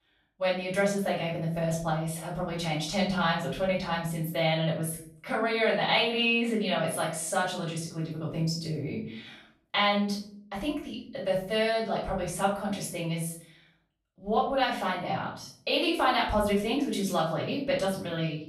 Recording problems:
off-mic speech; far
room echo; noticeable; dies away in 0.5 s

